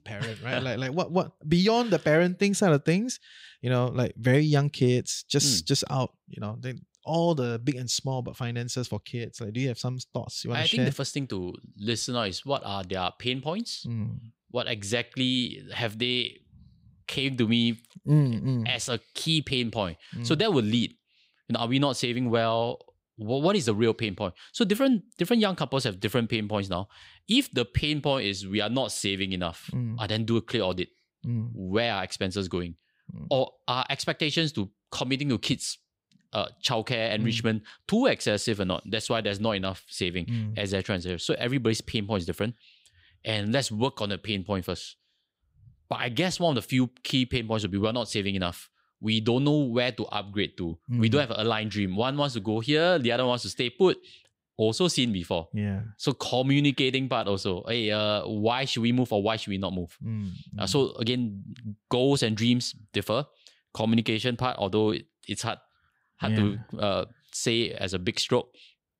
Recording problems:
none

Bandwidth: 15.5 kHz